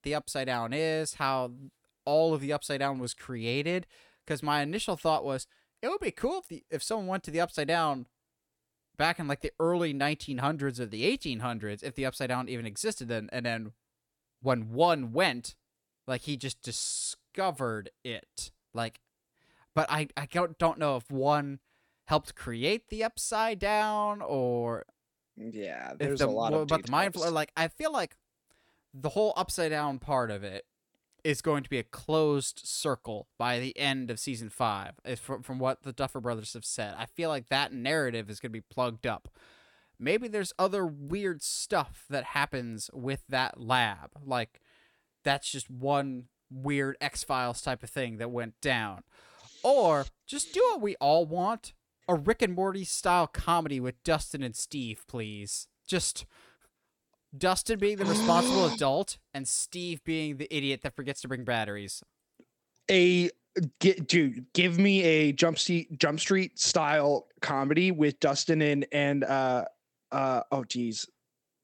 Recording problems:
none

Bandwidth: 17.5 kHz